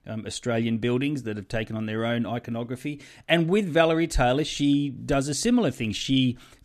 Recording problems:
none

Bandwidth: 14 kHz